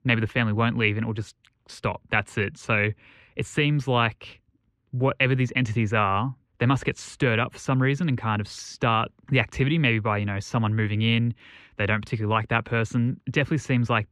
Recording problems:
muffled; very; fading above 2.5 kHz

